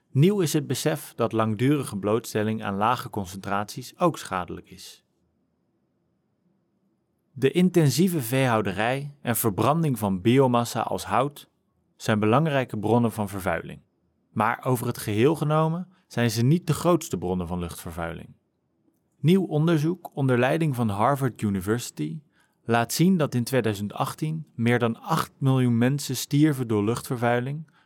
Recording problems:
none

